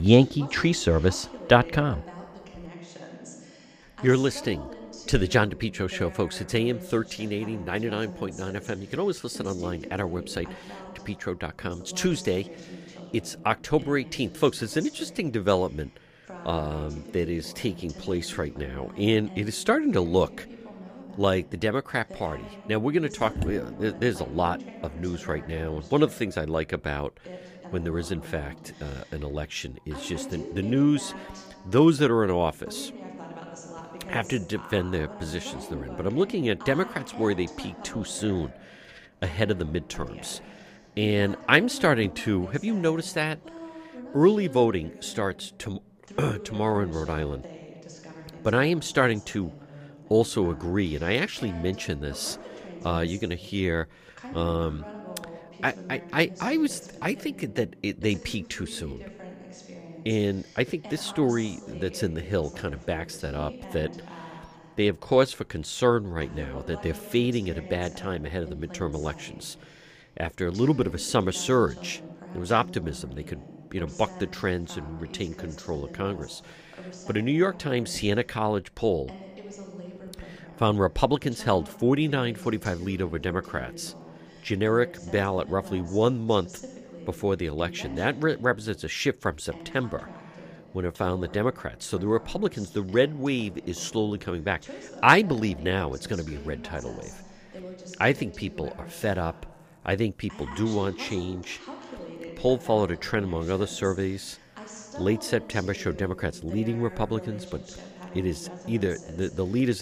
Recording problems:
voice in the background; noticeable; throughout; 15 dB below the speech
abrupt cut into speech; at the start and the end

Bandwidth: 15 kHz